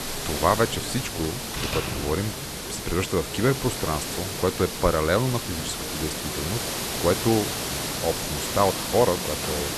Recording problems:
hiss; loud; throughout; 3 dB below the speech
household noises; noticeable; throughout; 15 dB below the speech
voice in the background; noticeable; throughout; 20 dB below the speech
electrical hum; faint; throughout; 60 Hz, 25 dB below the speech

